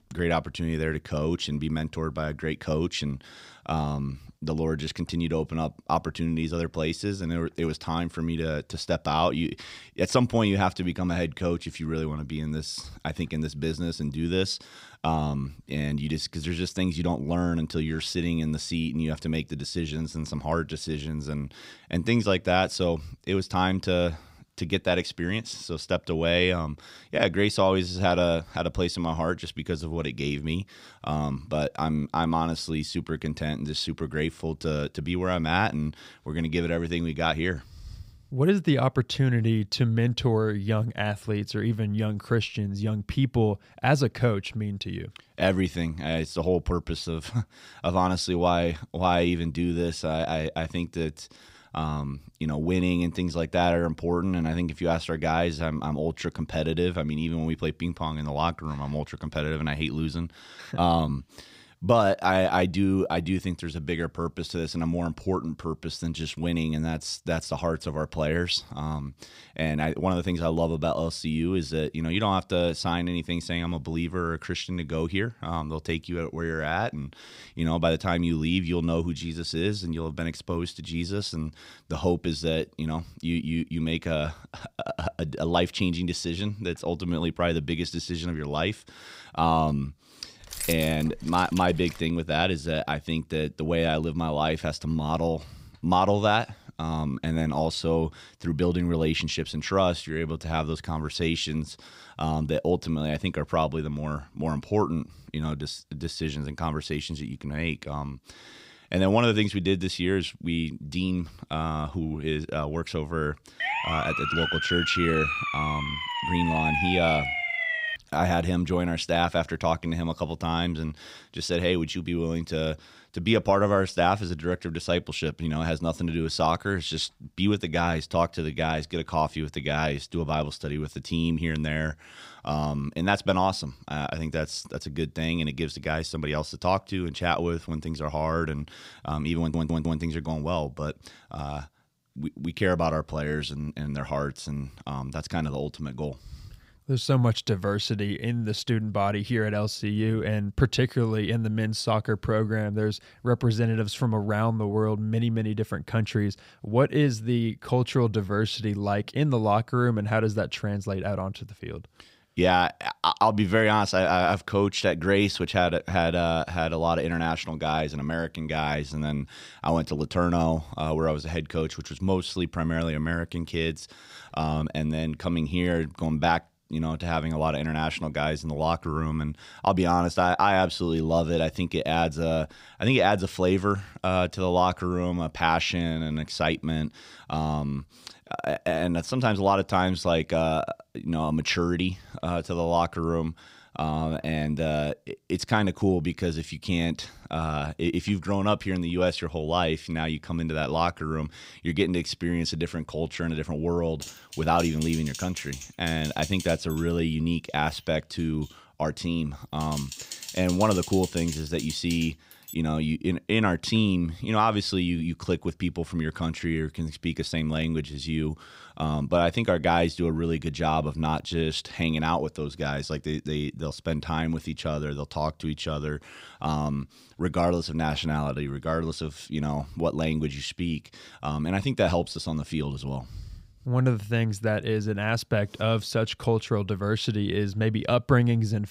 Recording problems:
jangling keys; noticeable; from 1:30 to 1:32; peak 4 dB below the speech
siren; loud; from 1:54 to 1:58; peak 2 dB above the speech
audio stuttering; at 2:19
keyboard typing; noticeable; from 3:24 to 3:33; peak 8 dB below the speech

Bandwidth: 15.5 kHz